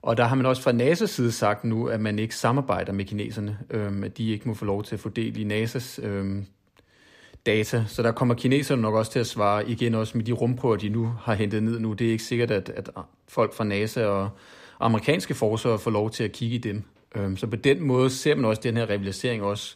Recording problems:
none

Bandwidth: 15 kHz